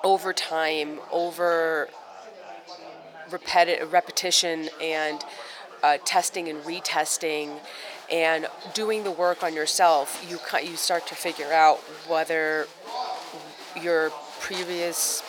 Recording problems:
thin; very; fading below 600 Hz
chatter from many people; noticeable; throughout; 15 dB below the speech

